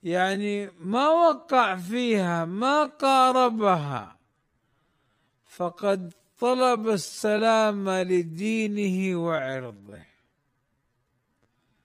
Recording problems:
wrong speed, natural pitch; too slow; 0.5 times normal speed

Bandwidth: 15 kHz